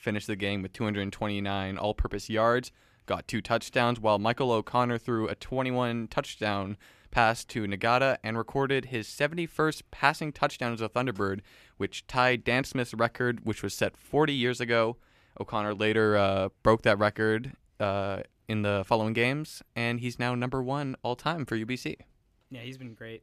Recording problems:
none

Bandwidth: 14.5 kHz